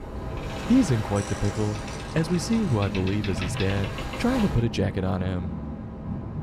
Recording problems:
train or aircraft noise; loud; throughout; 6 dB below the speech

